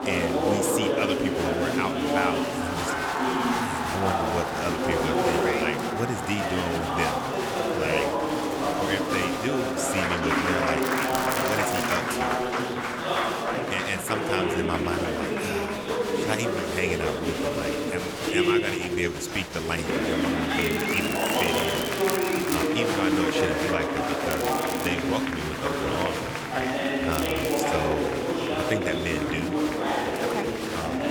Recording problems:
chatter from many people; very loud; throughout; 5 dB above the speech
crackling; loud; 4 times, first at 11 s; 4 dB below the speech

